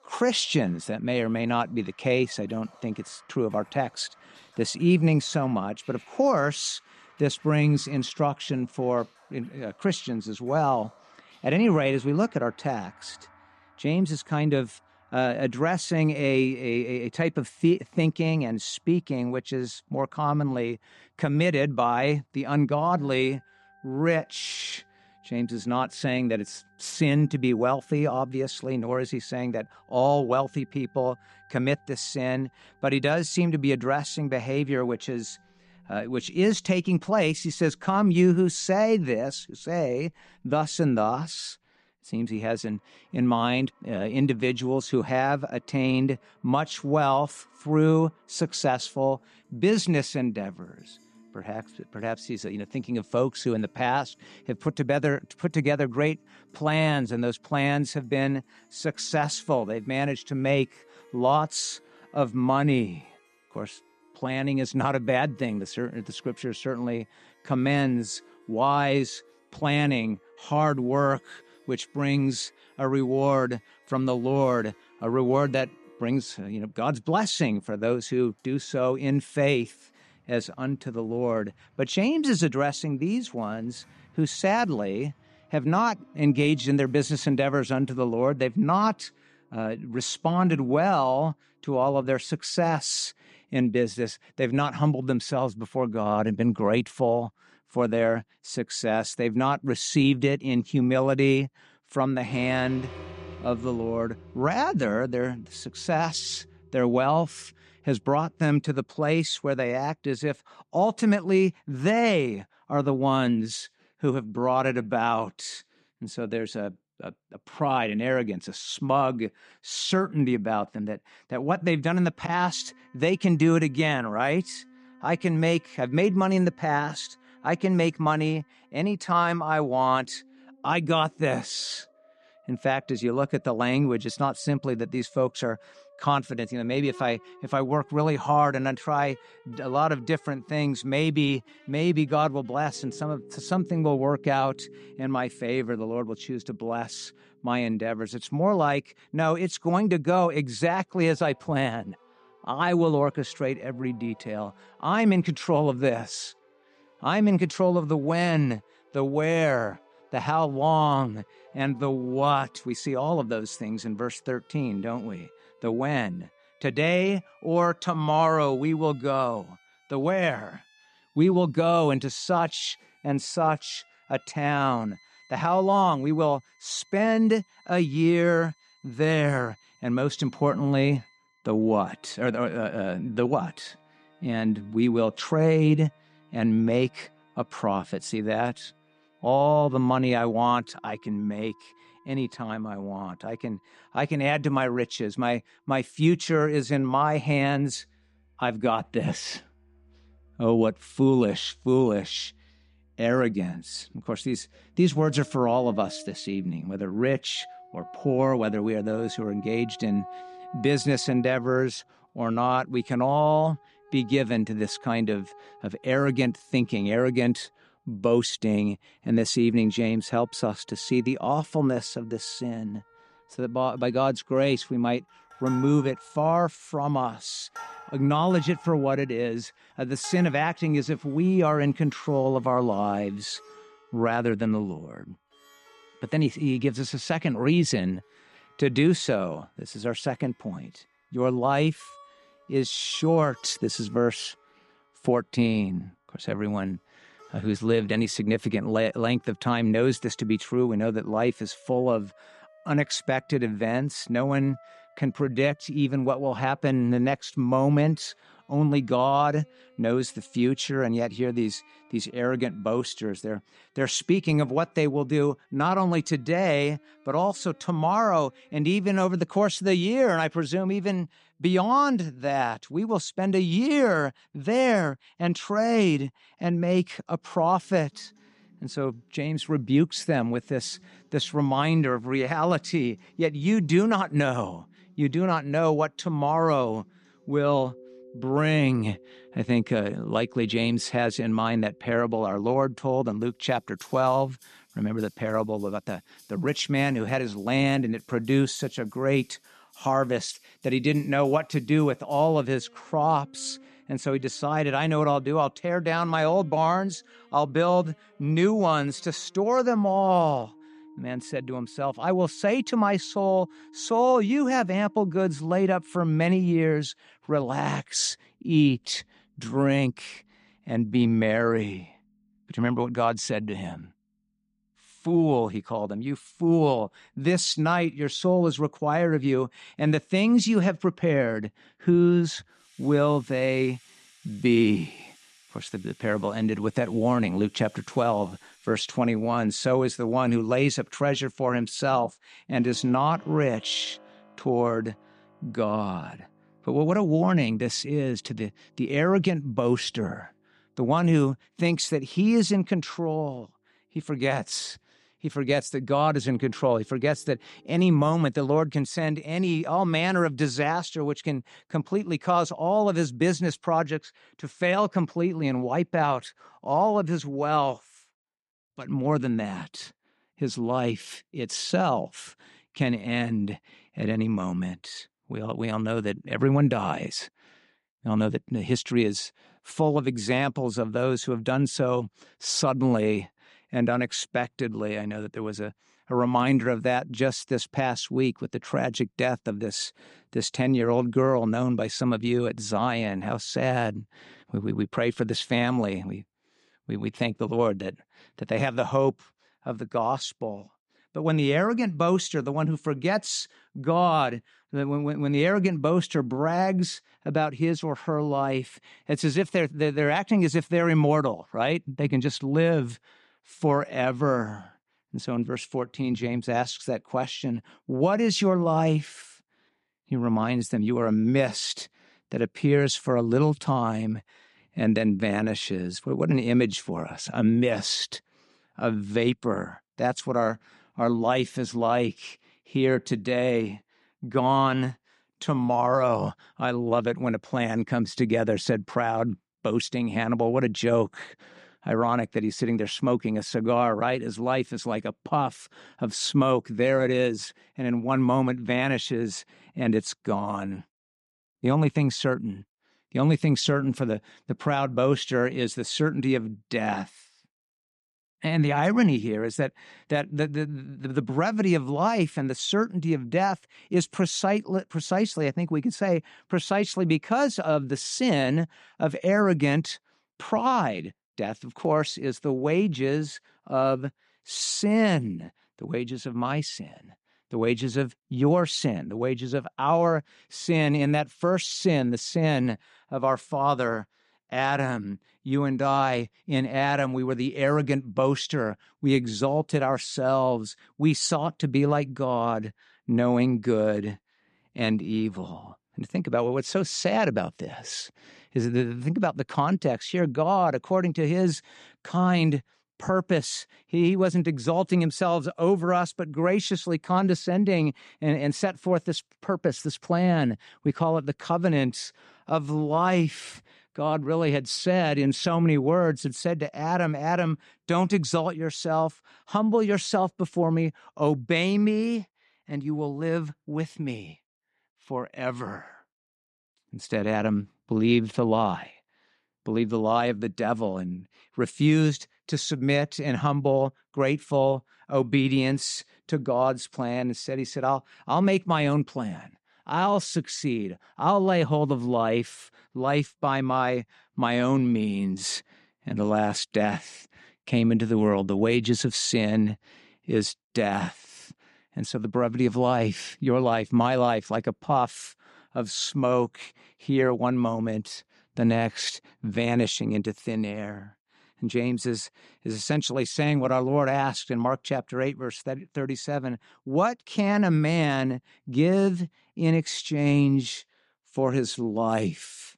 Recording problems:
background music; faint; until 5:58; 30 dB below the speech

